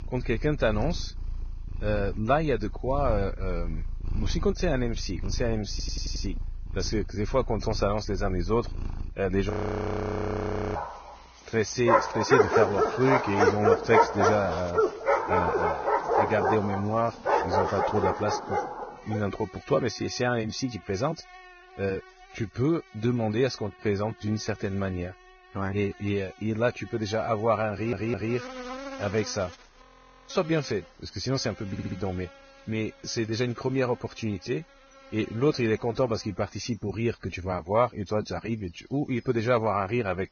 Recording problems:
garbled, watery; badly; nothing above 6.5 kHz
animal sounds; loud; throughout; 1 dB below the speech
audio stuttering; at 5.5 s, at 28 s and at 32 s
audio freezing; at 9.5 s for 1.5 s and at 30 s

